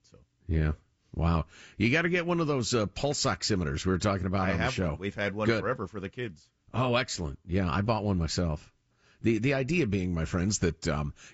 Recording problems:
high frequencies cut off; noticeable; nothing above 7.5 kHz

